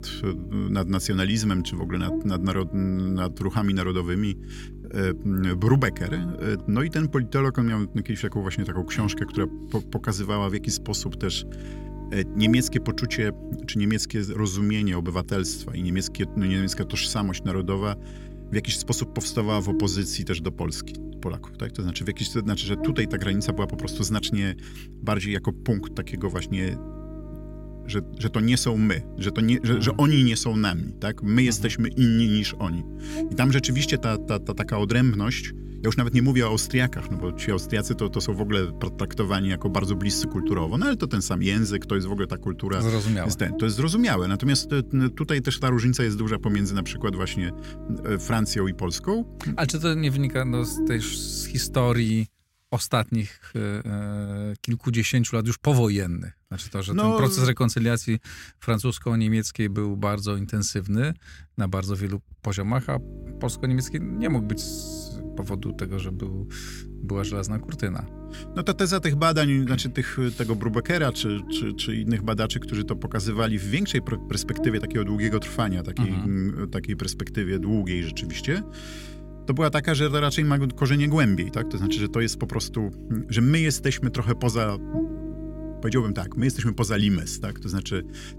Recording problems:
electrical hum; noticeable; until 52 s and from 1:03 on; 50 Hz, 15 dB below the speech

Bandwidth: 16 kHz